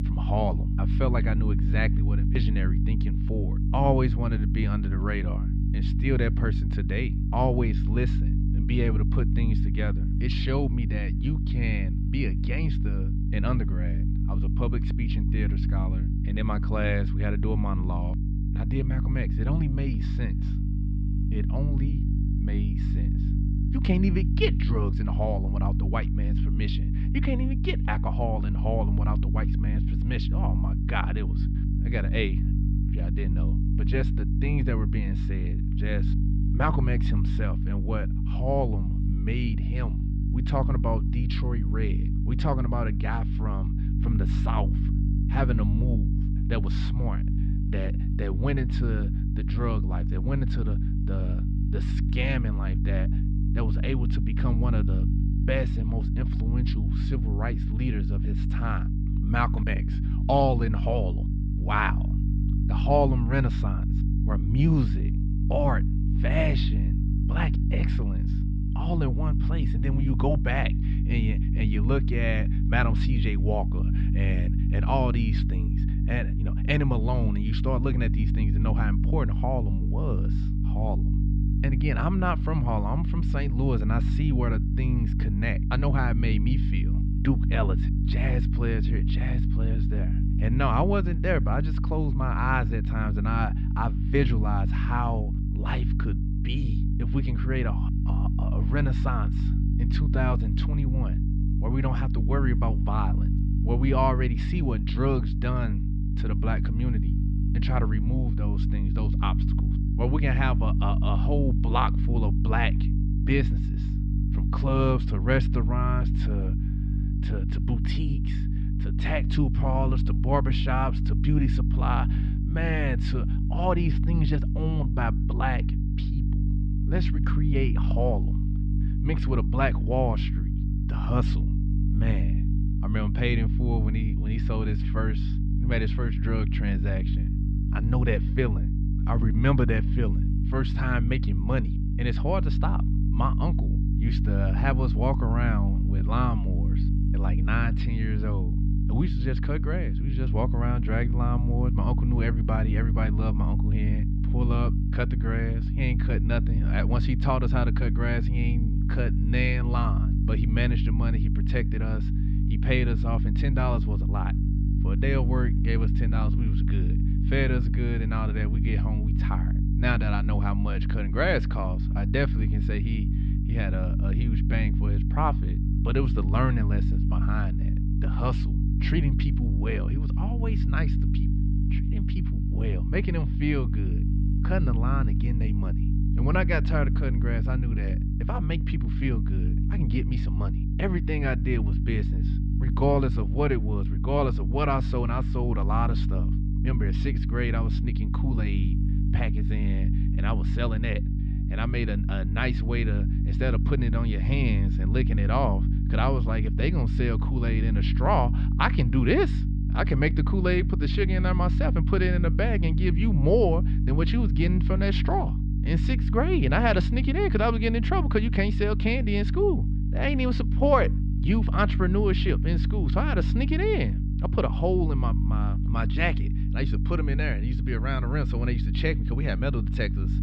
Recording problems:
muffled; slightly; fading above 4 kHz
electrical hum; loud; throughout; 50 Hz, 7 dB below the speech

